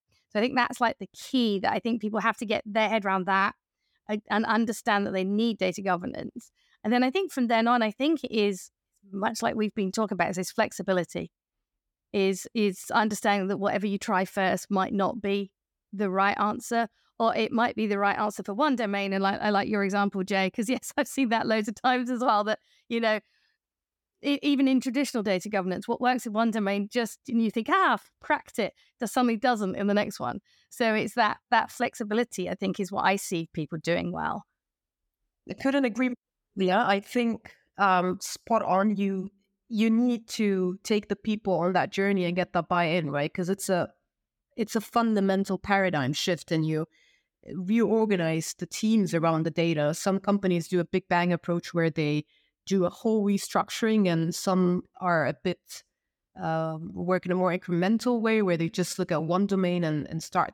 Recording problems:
none

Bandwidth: 17.5 kHz